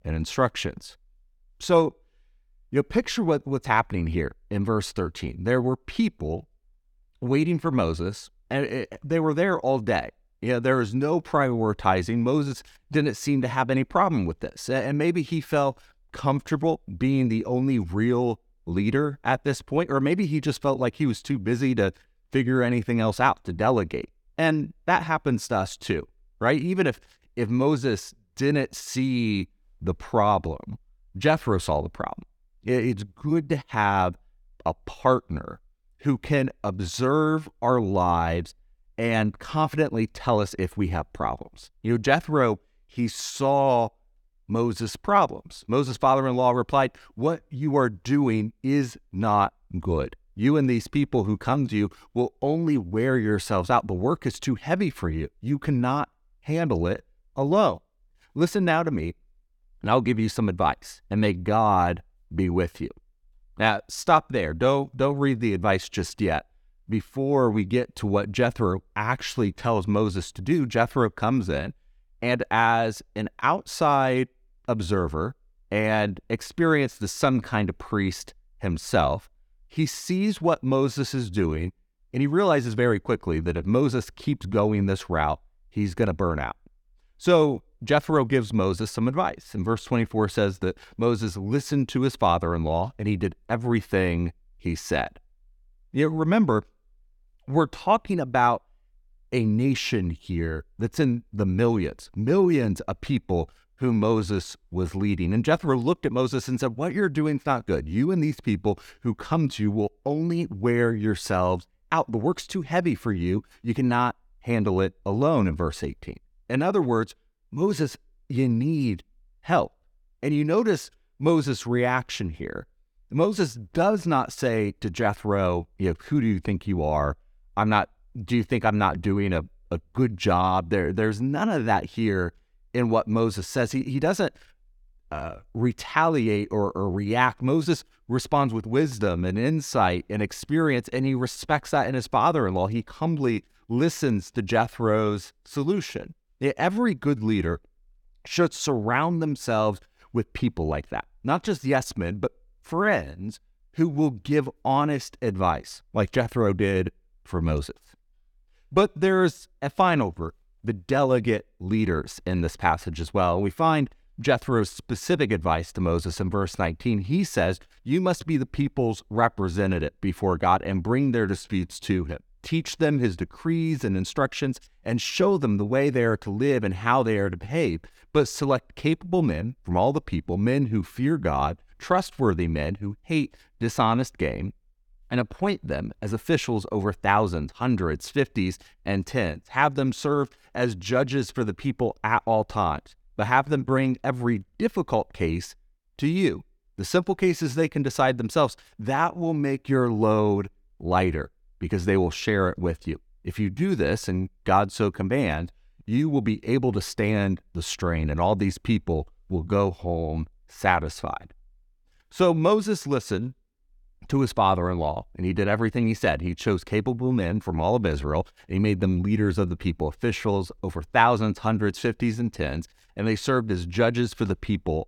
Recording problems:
none

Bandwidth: 18 kHz